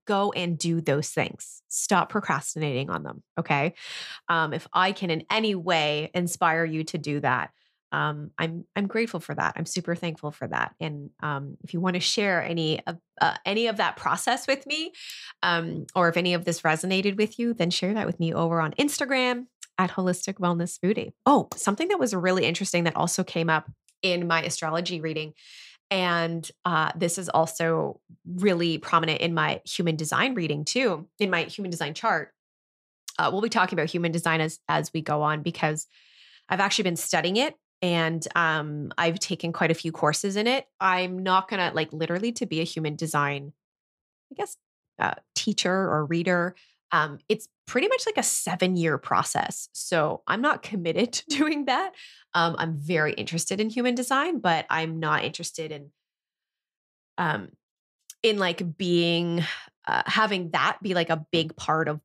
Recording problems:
none

